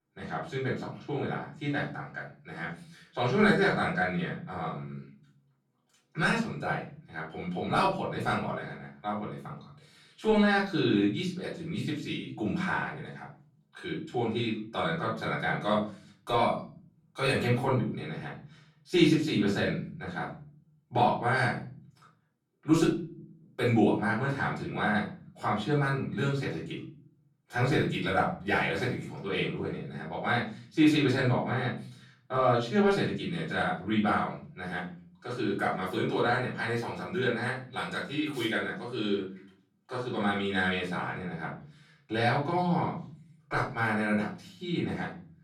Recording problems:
off-mic speech; far
room echo; slight; dies away in 0.5 s

